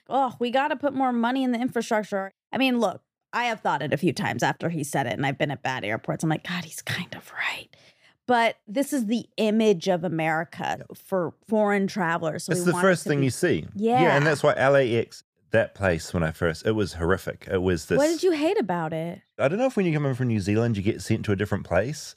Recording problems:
none

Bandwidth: 15 kHz